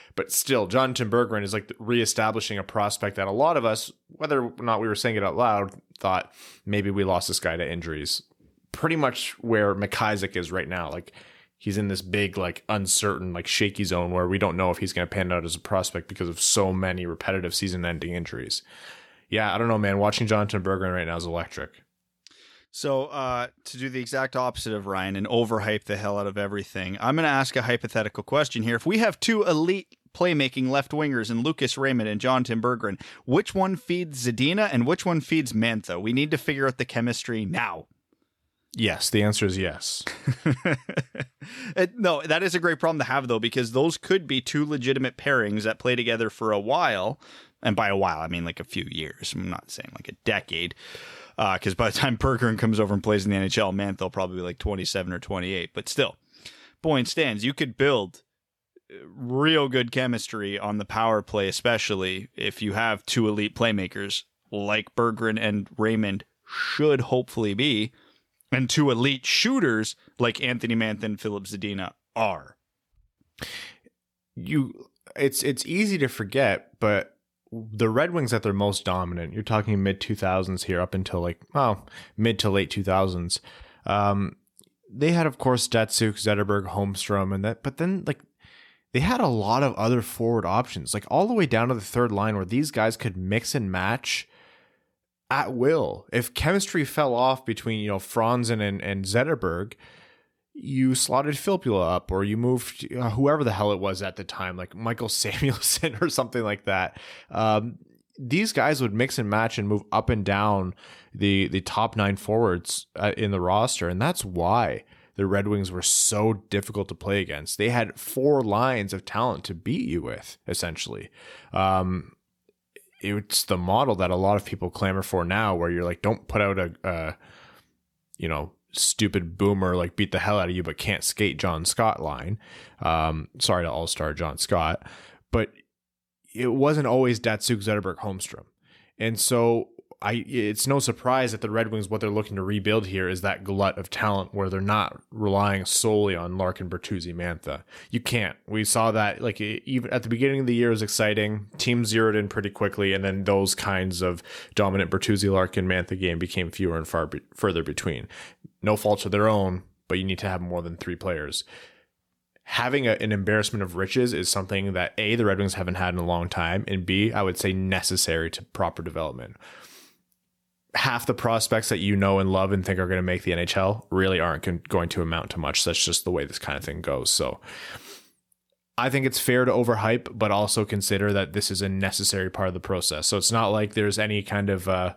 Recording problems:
none

